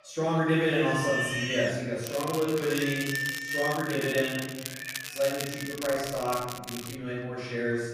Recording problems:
room echo; strong; dies away in 1.2 s
off-mic speech; far
animal sounds; loud; throughout; 4 dB below the speech
crackling; loud; from 2 to 7 s; 9 dB below the speech

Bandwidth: 15 kHz